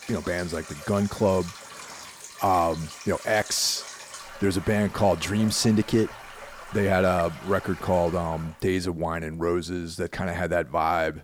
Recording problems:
rain or running water; noticeable; until 8.5 s; 15 dB below the speech

